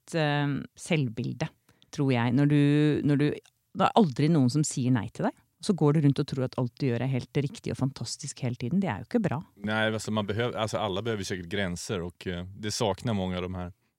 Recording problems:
none

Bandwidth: 16 kHz